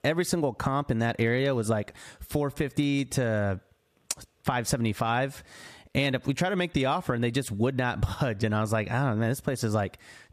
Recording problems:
squashed, flat; somewhat

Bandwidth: 14.5 kHz